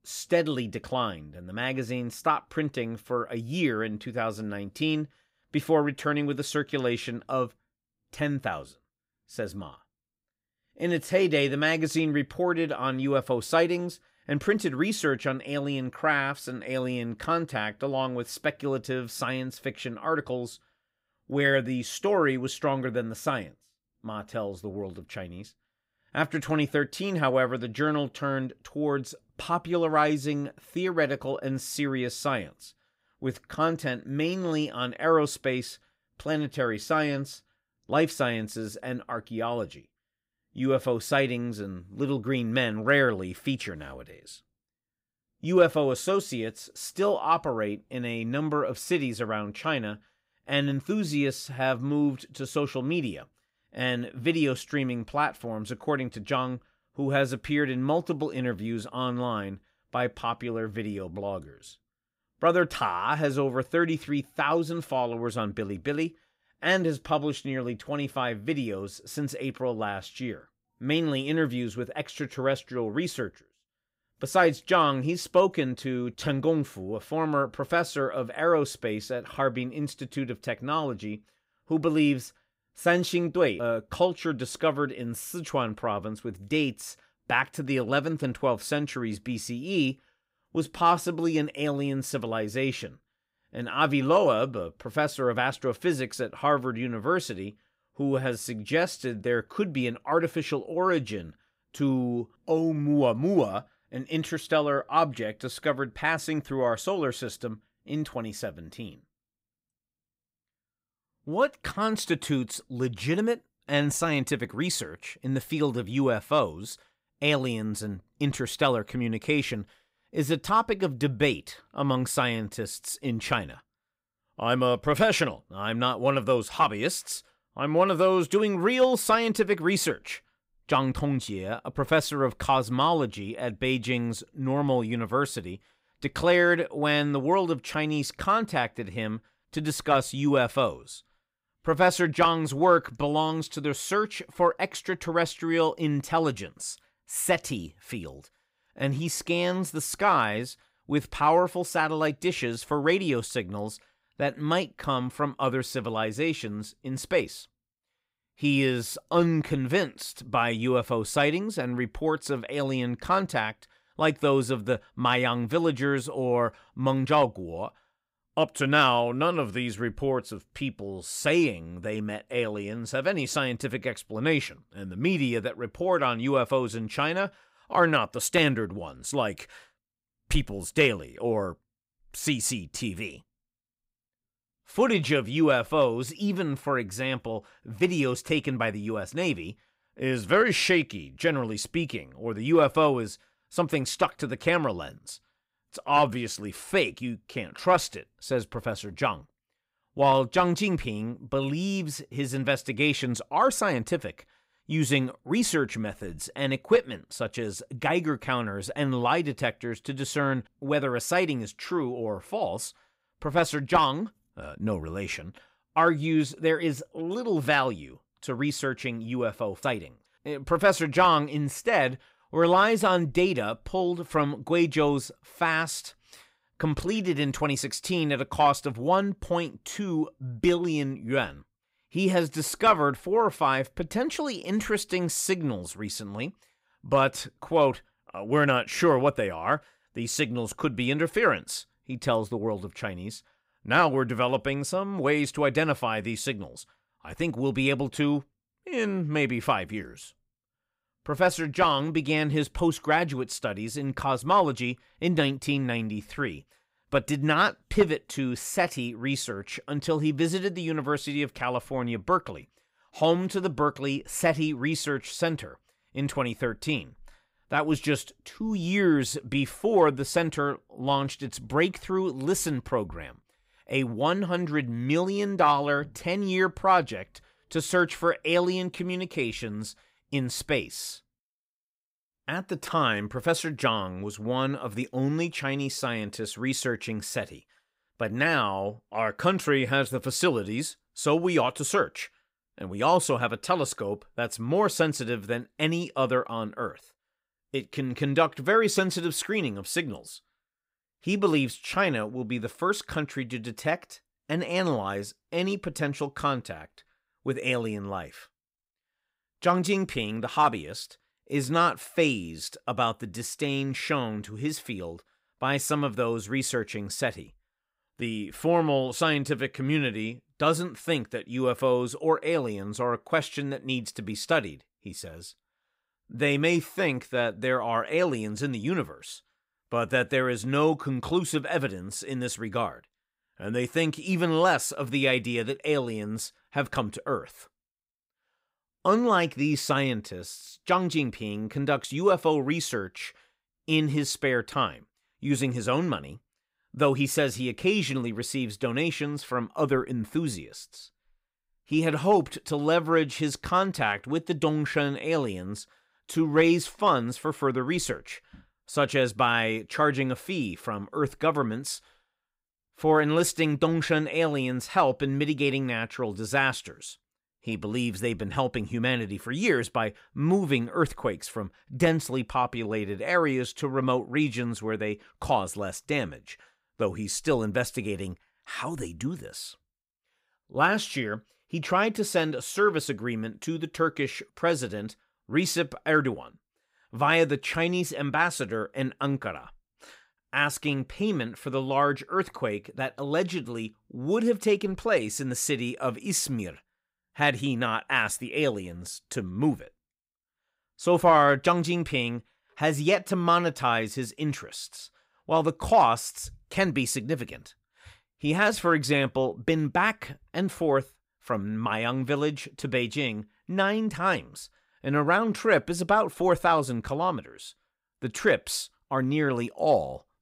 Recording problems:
none

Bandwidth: 15.5 kHz